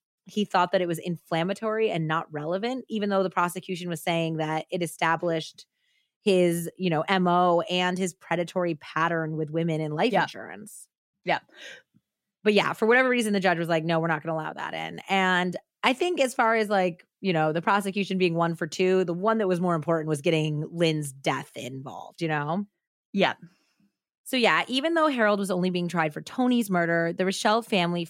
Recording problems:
none

